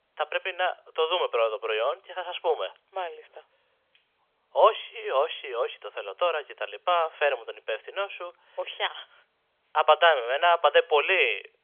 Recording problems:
thin; very; fading below 450 Hz
phone-call audio; nothing above 3.5 kHz

